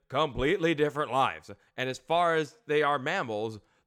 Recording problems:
none

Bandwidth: 17.5 kHz